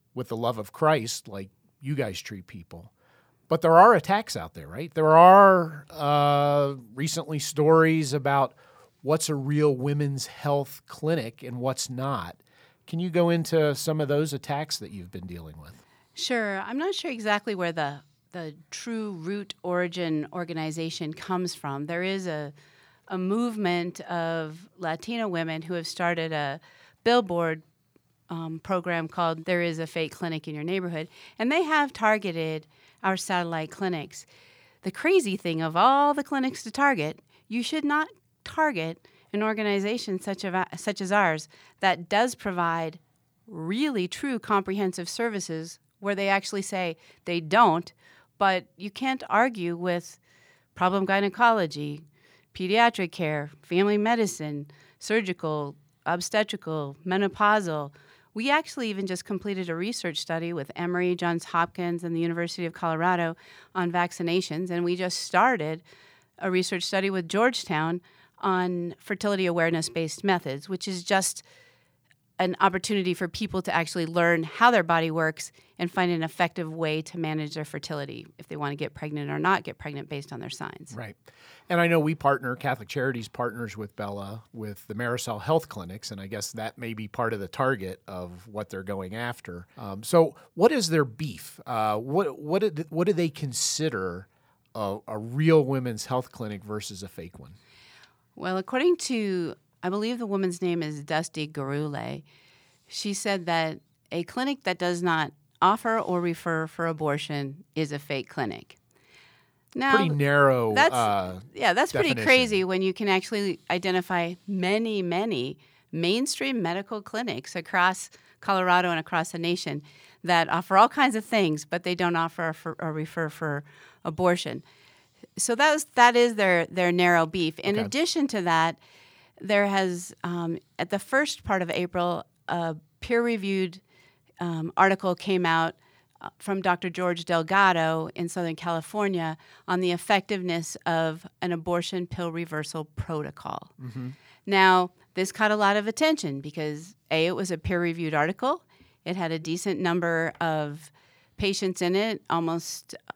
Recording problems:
none

